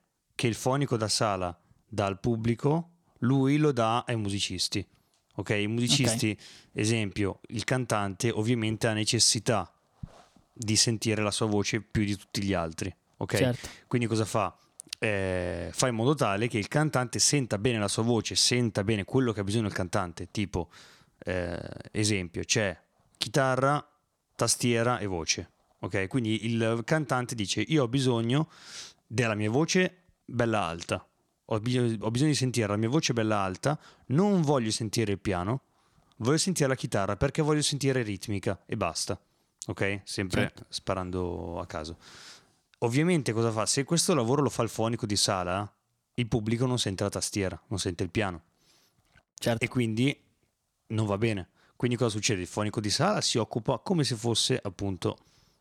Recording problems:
none

